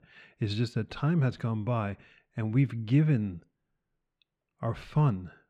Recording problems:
muffled; slightly; fading above 2.5 kHz

